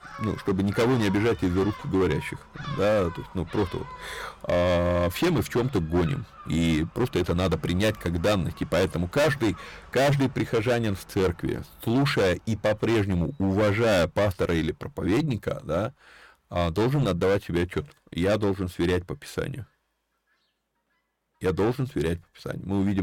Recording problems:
distortion; heavy; 12% of the sound clipped
animal sounds; noticeable; throughout; 20 dB below the speech
abrupt cut into speech; at the end

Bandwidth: 17 kHz